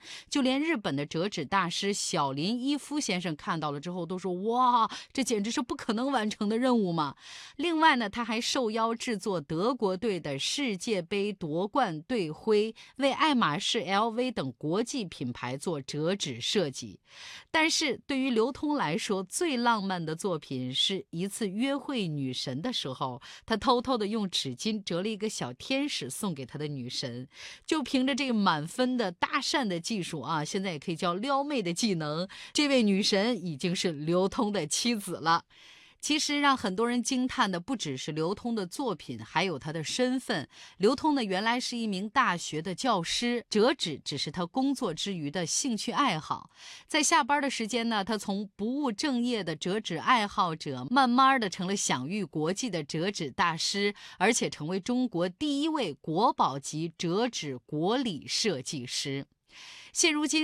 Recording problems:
abrupt cut into speech; at the end

